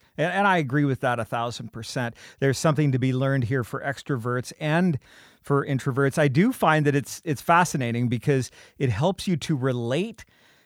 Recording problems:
none

